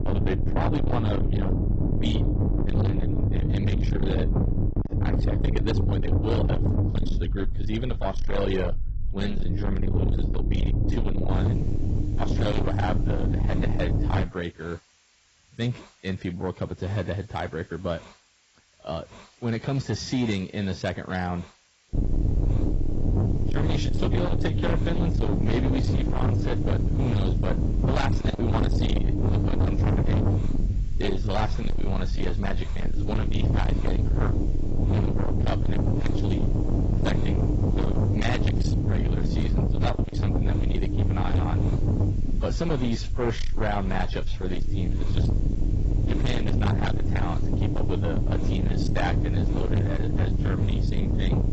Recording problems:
distortion; heavy; 6 dB below the speech
garbled, watery; badly; nothing above 7.5 kHz
low rumble; loud; until 14 s and from 22 s on; 3 dB below the speech
hiss; faint; from 11 s on; 25 dB below the speech

